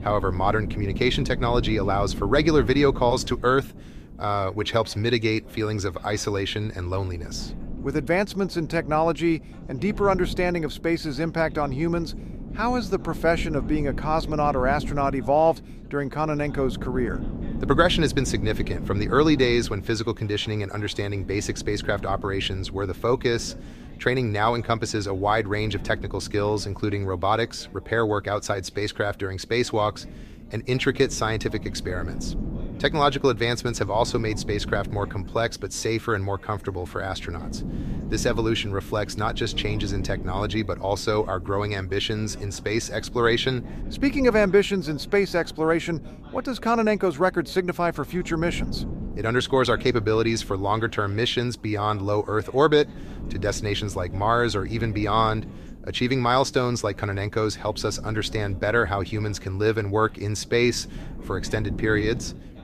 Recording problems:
wind noise on the microphone; occasional gusts; 20 dB below the speech
background chatter; faint; throughout; 3 voices, 25 dB below the speech

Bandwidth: 14.5 kHz